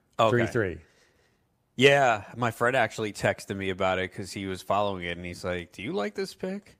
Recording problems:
none

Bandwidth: 15 kHz